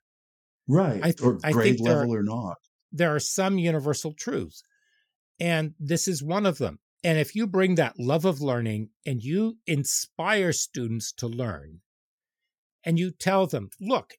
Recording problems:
none

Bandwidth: 18 kHz